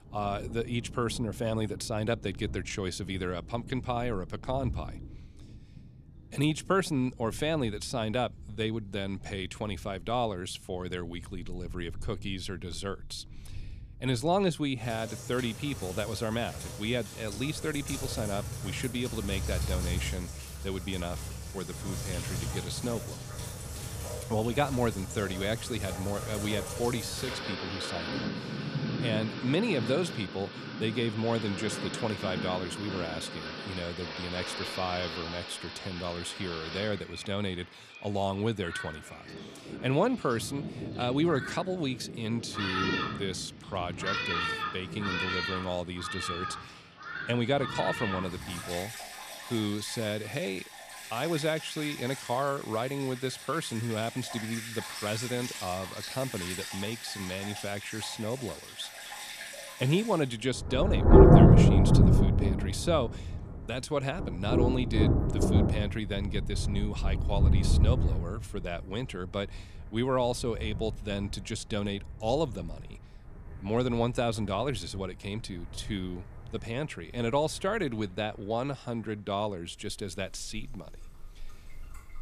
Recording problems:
rain or running water; very loud; throughout; 2 dB above the speech

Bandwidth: 14.5 kHz